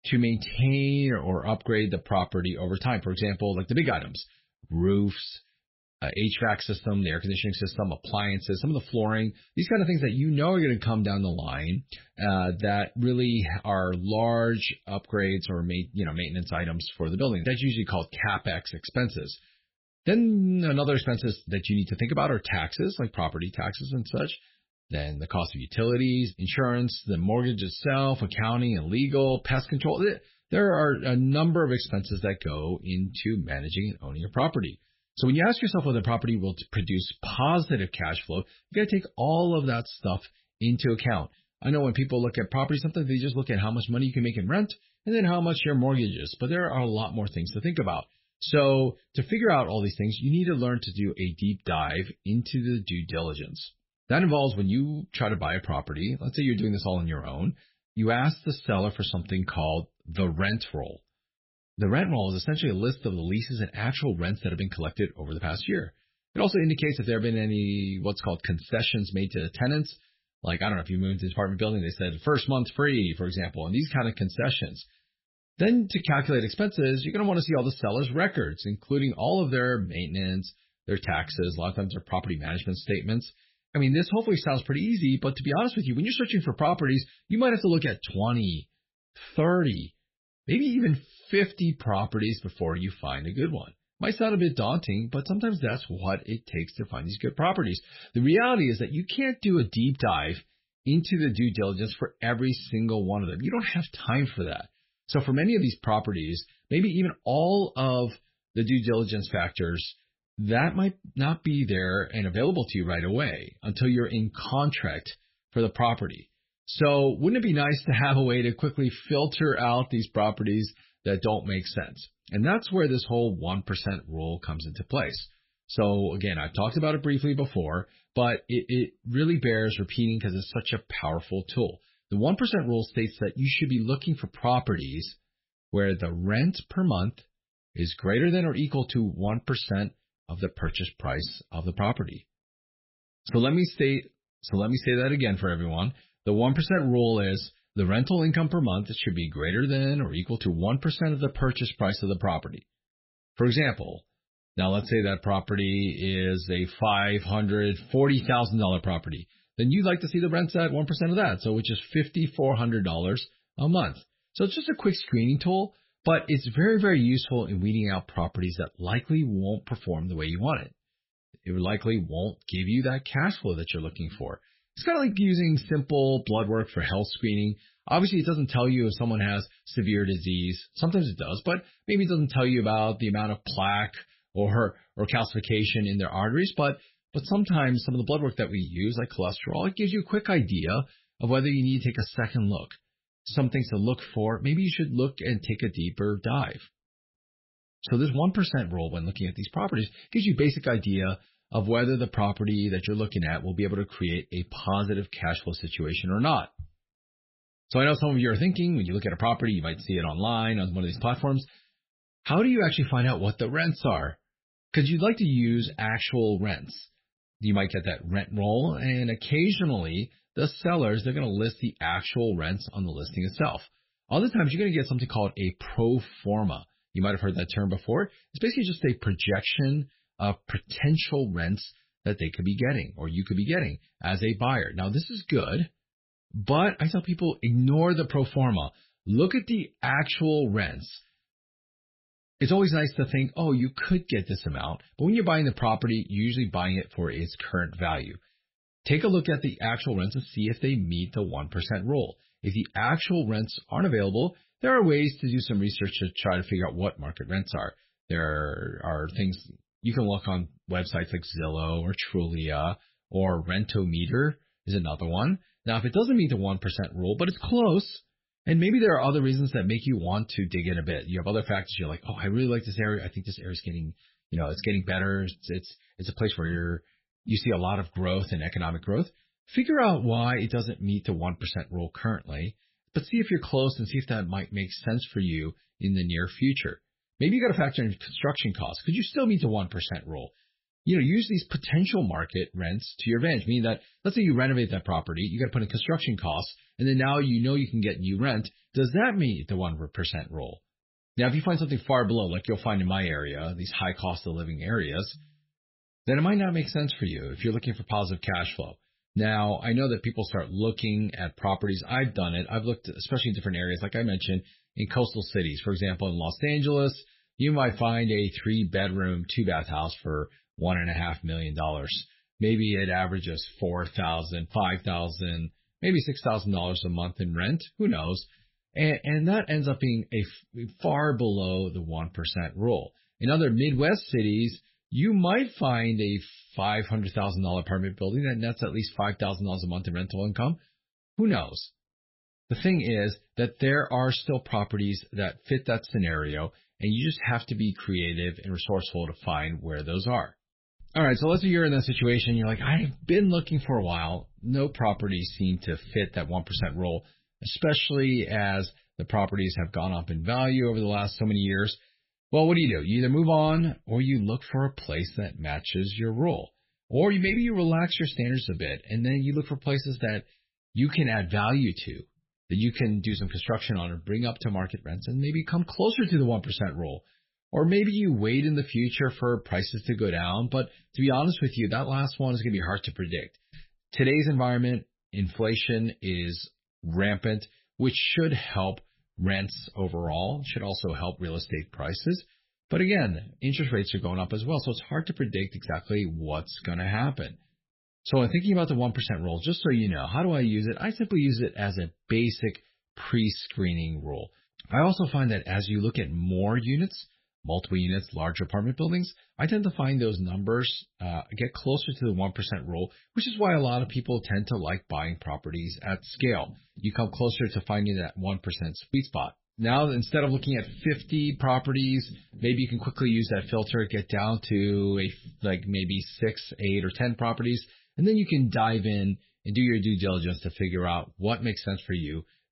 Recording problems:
garbled, watery; badly; nothing above 5.5 kHz

